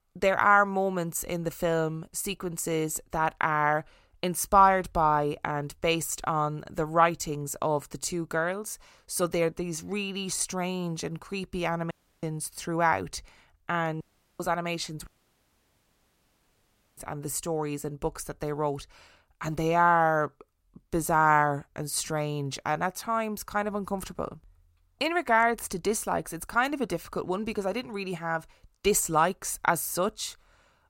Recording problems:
audio cutting out; at 12 s, at 14 s and at 15 s for 2 s

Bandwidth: 16 kHz